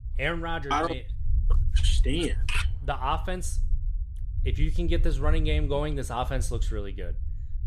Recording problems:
low rumble; faint; throughout; 20 dB below the speech

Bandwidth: 14.5 kHz